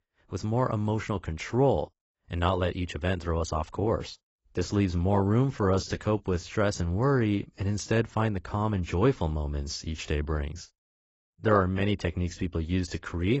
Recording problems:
garbled, watery; badly; nothing above 8 kHz
abrupt cut into speech; at the end

